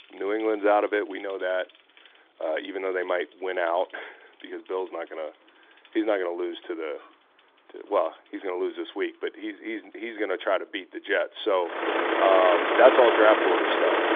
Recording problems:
phone-call audio; nothing above 3.5 kHz
traffic noise; very loud; throughout; 2 dB above the speech

